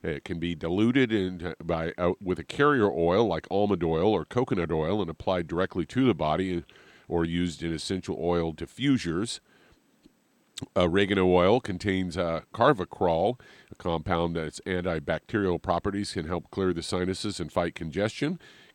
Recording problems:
none

